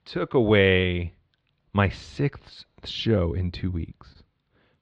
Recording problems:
muffled; slightly; fading above 4 kHz

